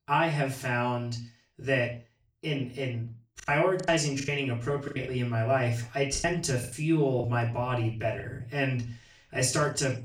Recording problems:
off-mic speech; far
room echo; slight; dies away in 0.3 s
choppy; very; from 3.5 to 5 s and from 6 to 8.5 s; 12% of the speech affected

